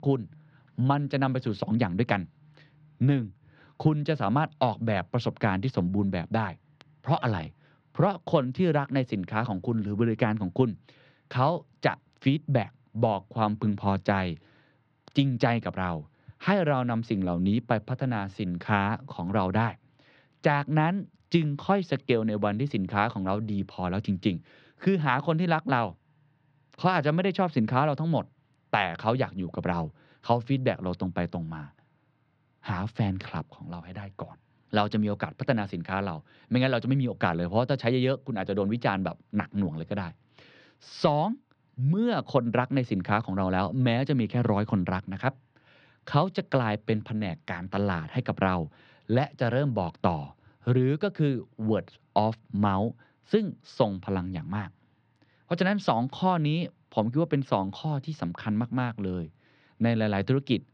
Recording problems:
muffled; slightly; fading above 4 kHz

